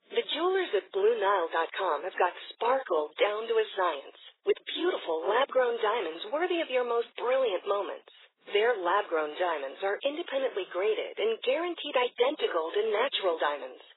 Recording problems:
garbled, watery; badly; nothing above 4 kHz
thin; very; fading below 400 Hz

